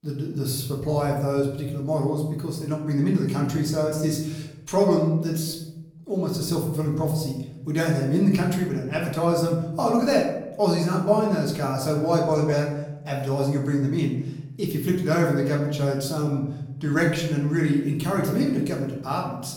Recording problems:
off-mic speech; far
room echo; noticeable; dies away in 0.9 s

